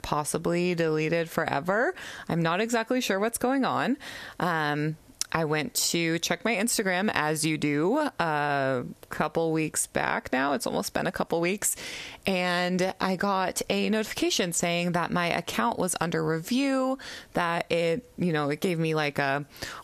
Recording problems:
squashed, flat; somewhat

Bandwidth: 14 kHz